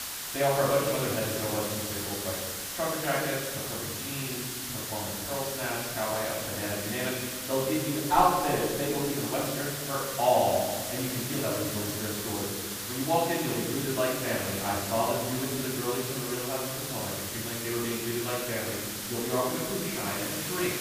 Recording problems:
off-mic speech; far
room echo; noticeable; dies away in 1.5 s
hiss; loud; throughout; 3 dB below the speech

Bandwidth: 15 kHz